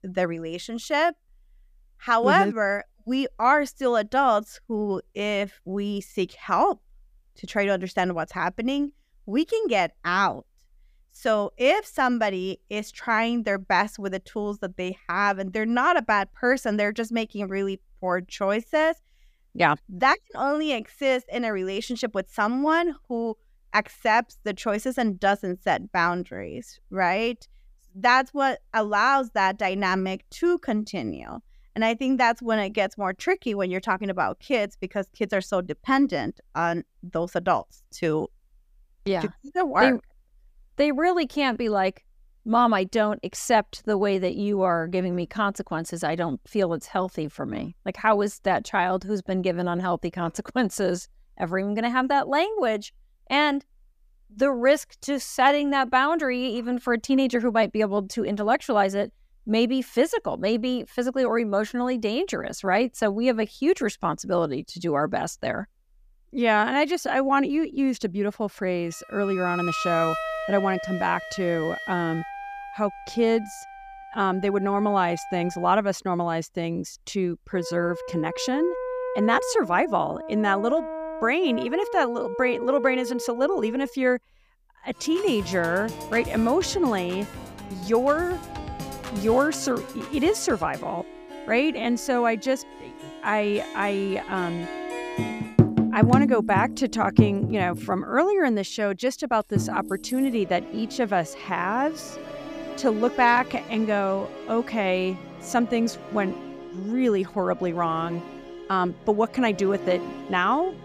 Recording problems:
background music; loud; from 1:10 on; 7 dB below the speech

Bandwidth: 15 kHz